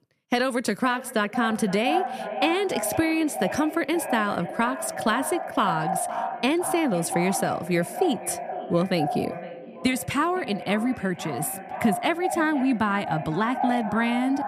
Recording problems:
echo of what is said; strong; throughout; 510 ms later, 7 dB below the speech

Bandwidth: 14.5 kHz